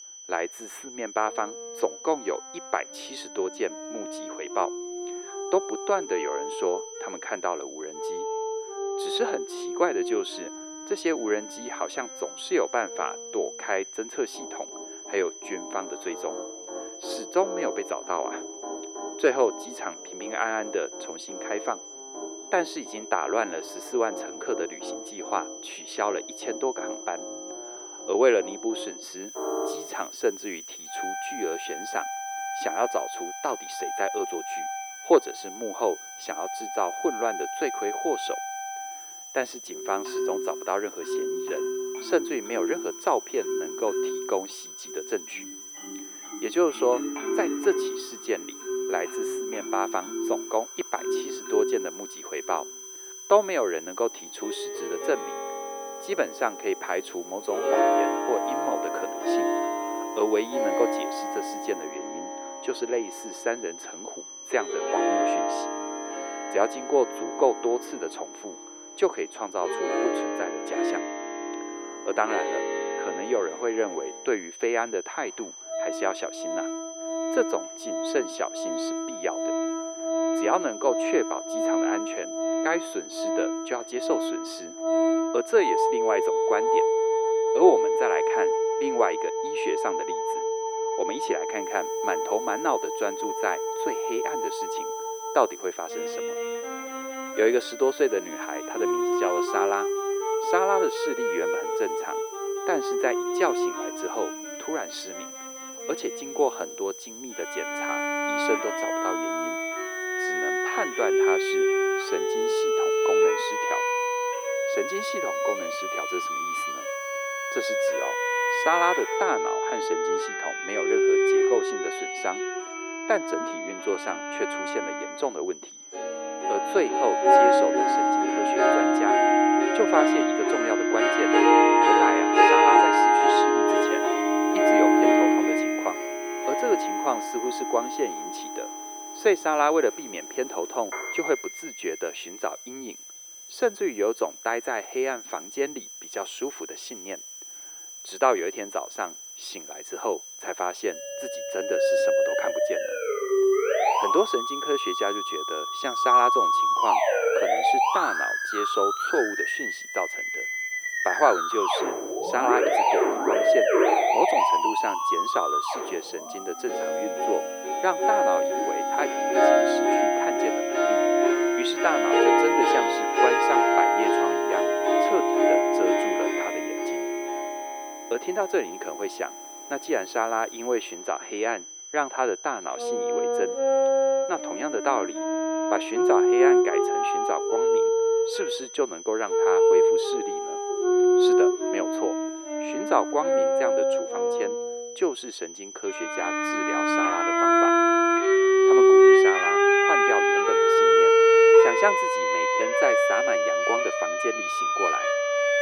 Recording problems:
thin; very; fading below 350 Hz
muffled; slightly; fading above 3.5 kHz
background music; very loud; throughout; 5 dB above the speech
high-pitched whine; noticeable; throughout; 6 kHz, 10 dB below the speech
hiss; faint; from 29 s to 1:02, from 1:32 to 1:59 and from 2:14 to 3:01; 25 dB below the speech

